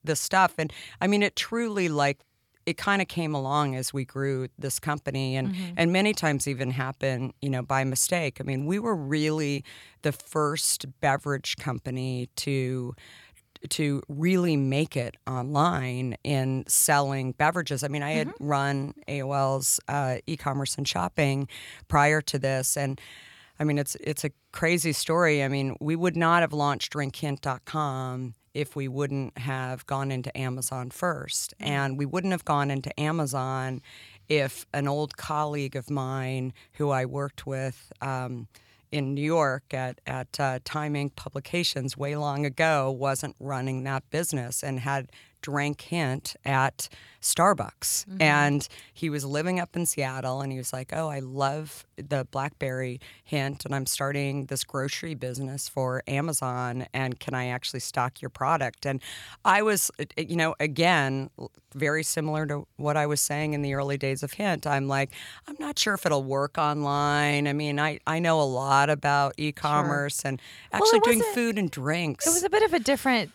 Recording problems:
none

